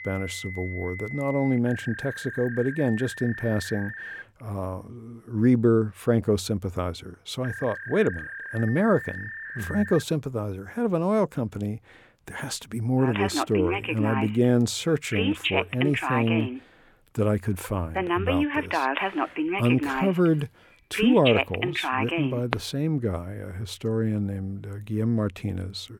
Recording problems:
alarms or sirens; loud; throughout; 4 dB below the speech

